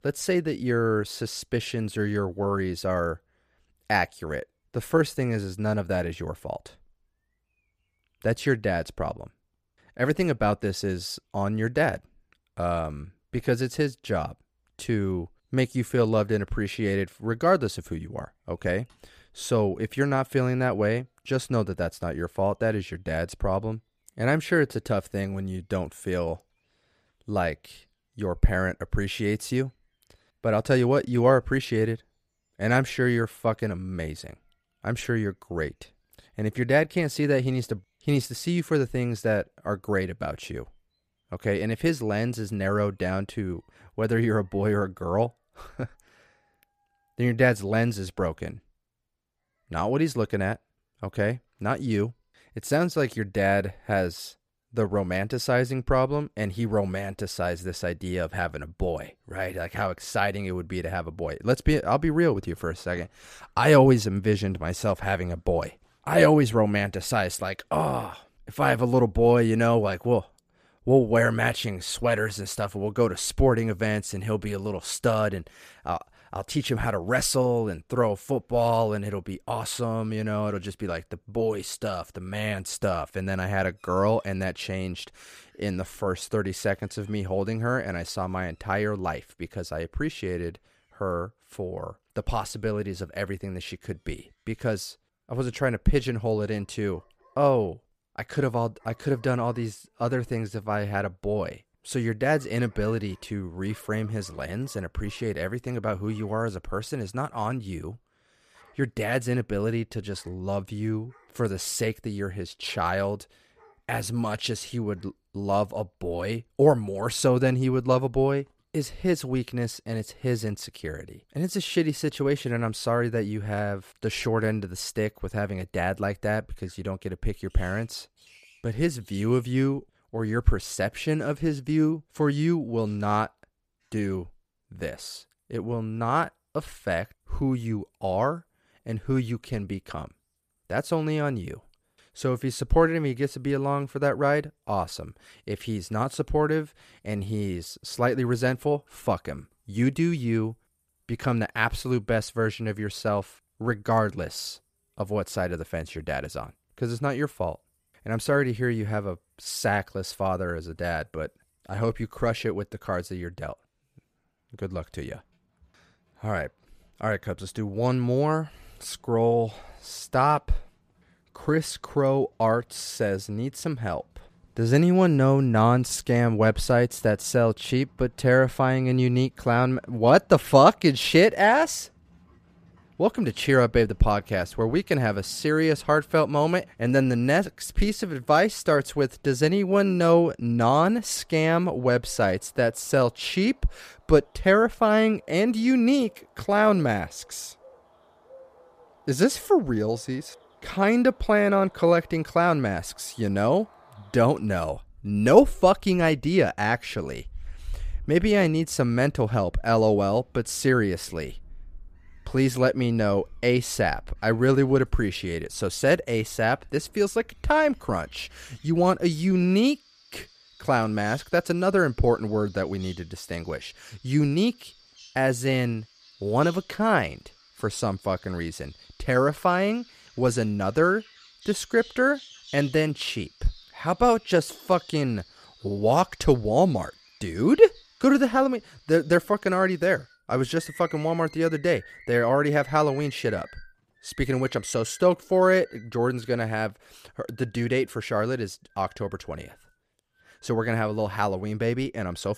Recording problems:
animal sounds; faint; throughout; 25 dB below the speech

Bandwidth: 14.5 kHz